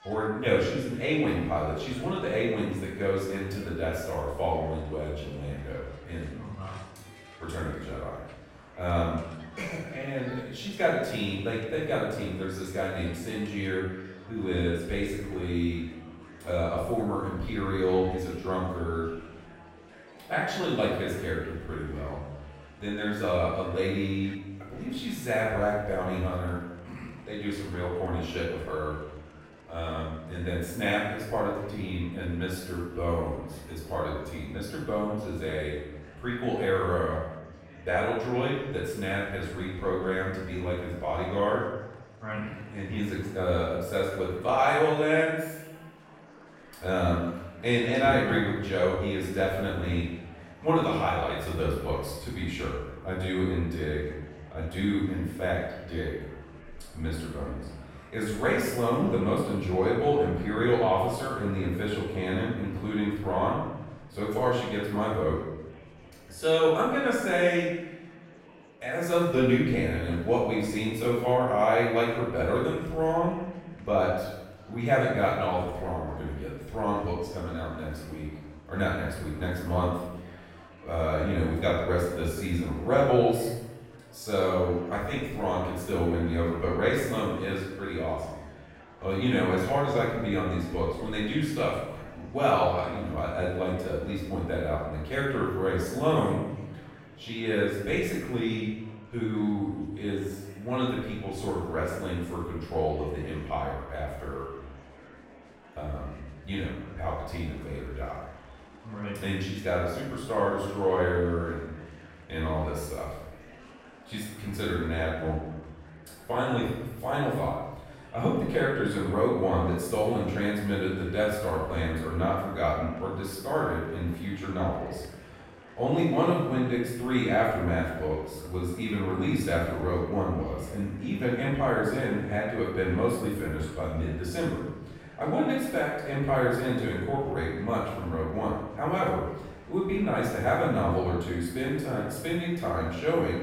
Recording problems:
room echo; strong; dies away in 1 s
off-mic speech; far
murmuring crowd; faint; throughout; 20 dB below the speech

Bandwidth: 16 kHz